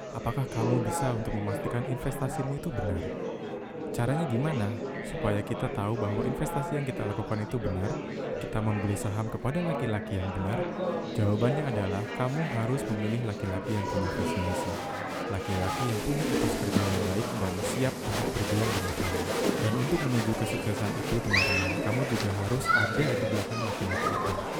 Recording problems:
murmuring crowd; very loud; throughout; as loud as the speech

